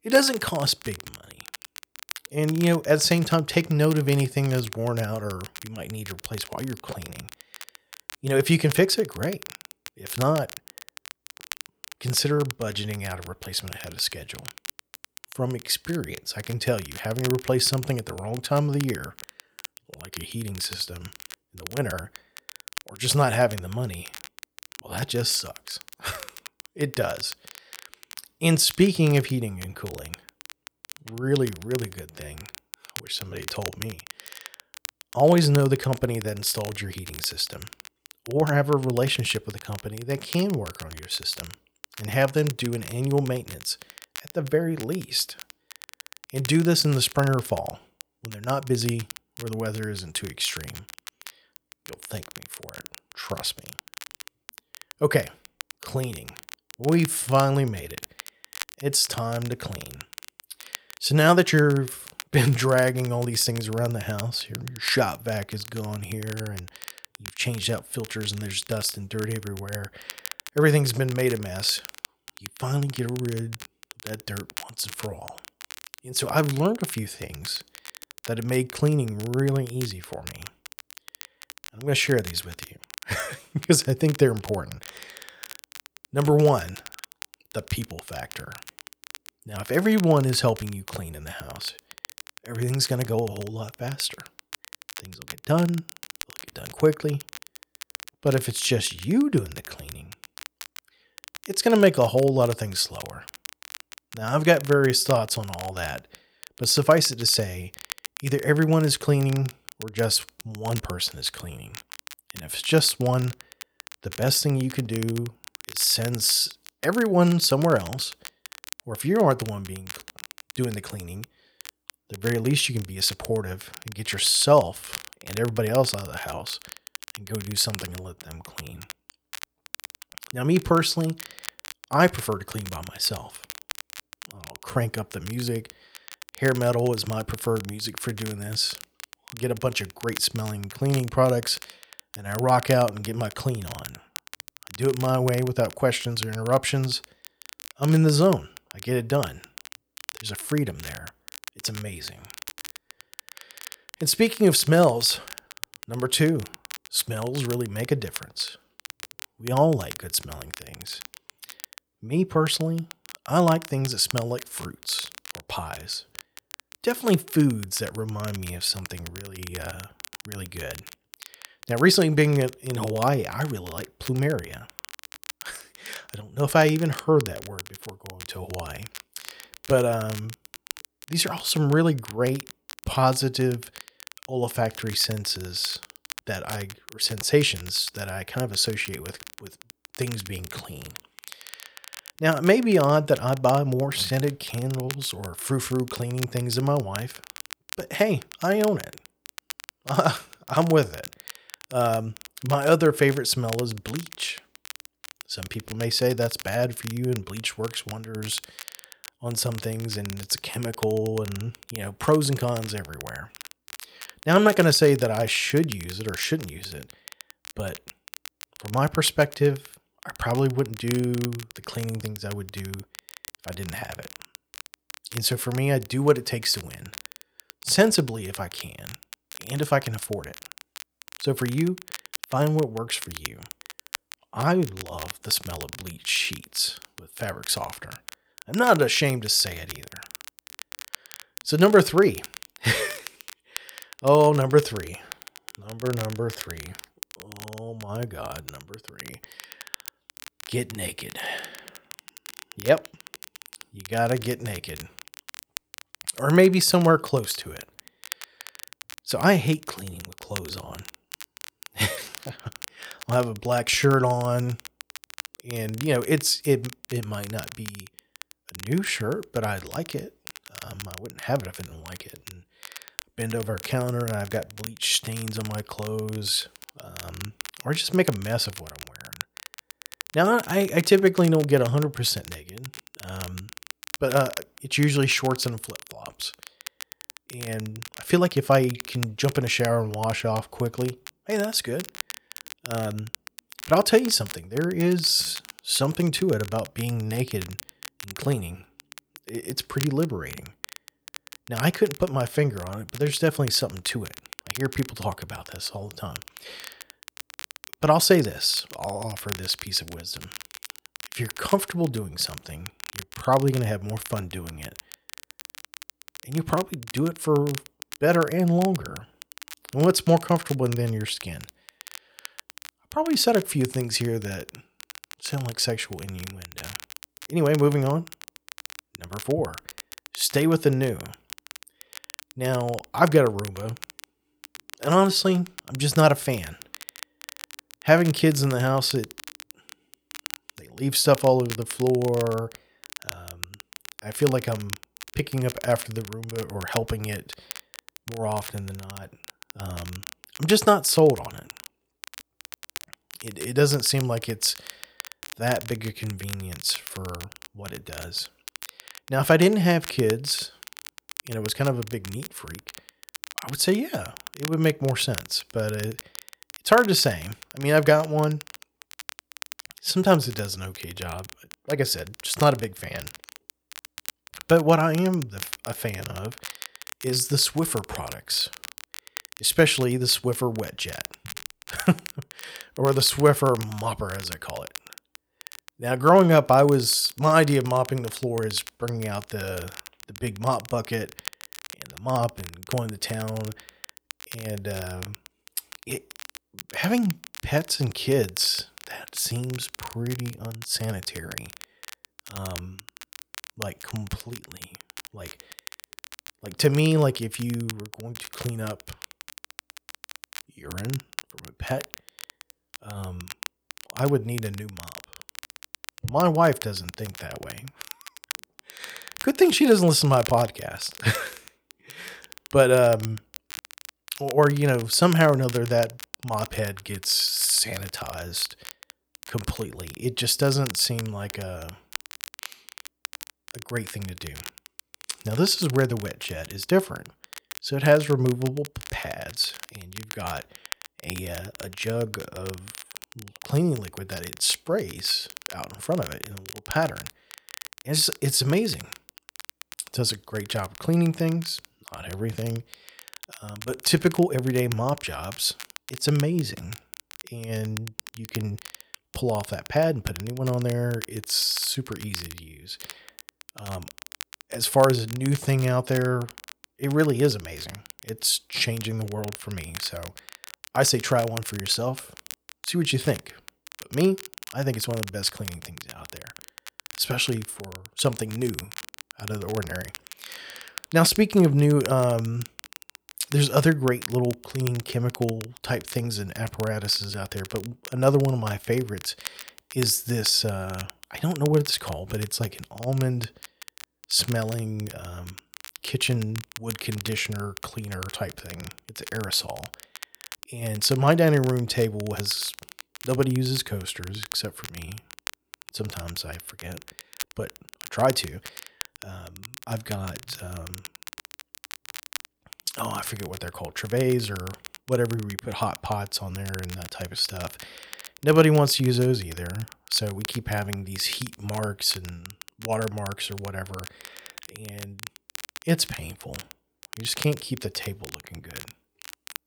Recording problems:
crackle, like an old record; noticeable; 15 dB below the speech

